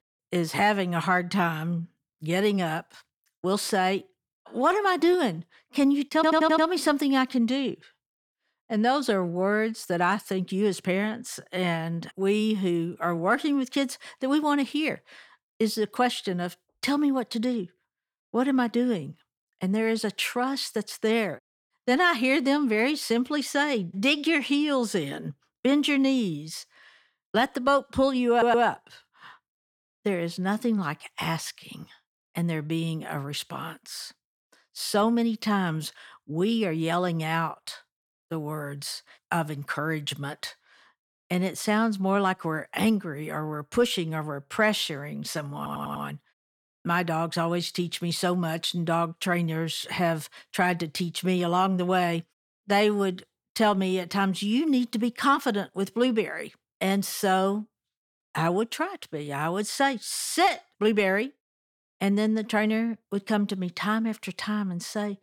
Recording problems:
audio stuttering; at 6 s, at 28 s and at 46 s

